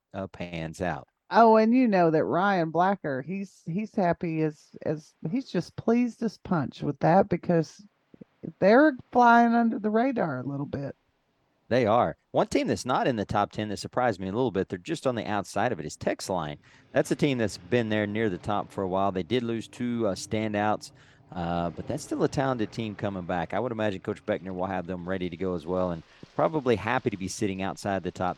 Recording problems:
rain or running water; faint; throughout; 30 dB below the speech

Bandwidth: 18 kHz